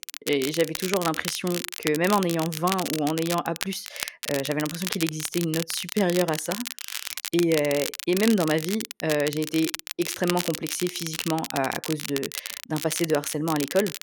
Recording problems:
crackle, like an old record; loud; 6 dB below the speech

